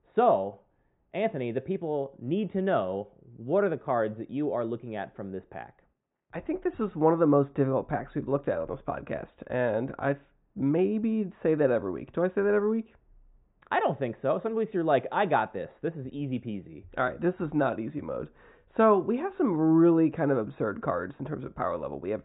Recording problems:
high frequencies cut off; severe; nothing above 4 kHz
muffled; very slightly; fading above 3 kHz

